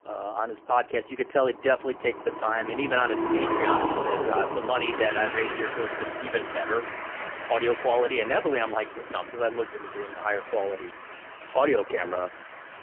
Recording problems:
phone-call audio; poor line; nothing above 3 kHz
traffic noise; loud; throughout; 5 dB below the speech

